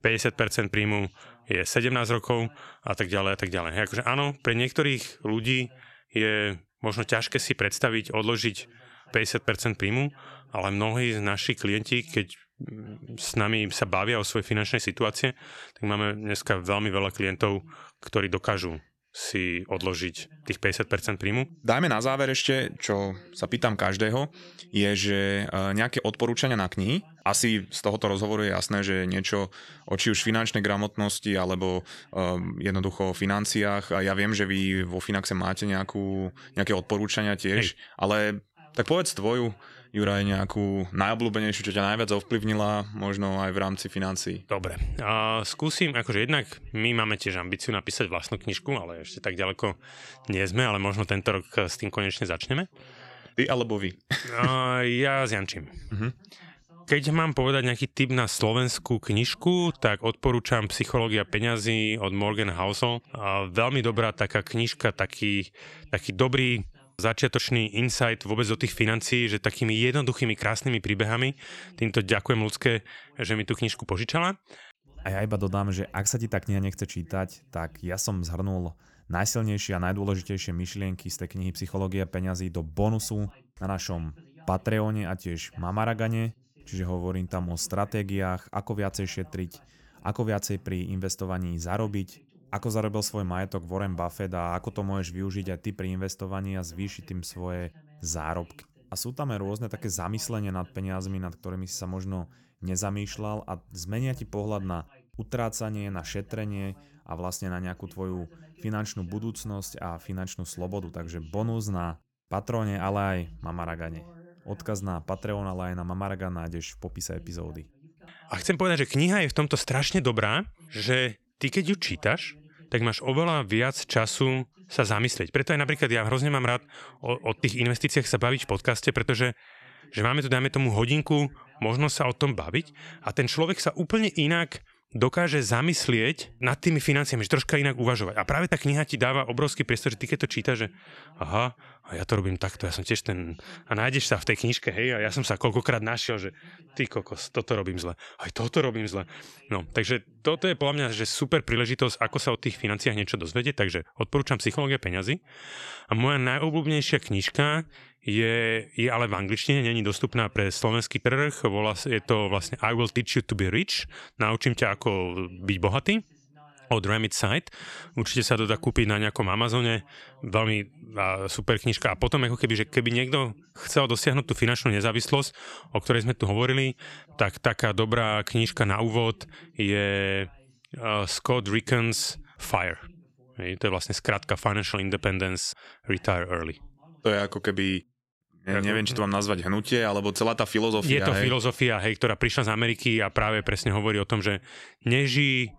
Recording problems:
voice in the background; faint; throughout; 30 dB below the speech

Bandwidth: 17.5 kHz